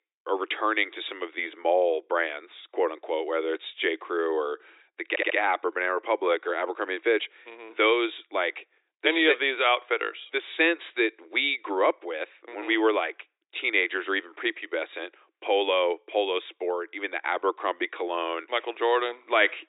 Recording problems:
thin; very; fading below 300 Hz
high frequencies cut off; severe; nothing above 4 kHz
audio stuttering; at 5 s

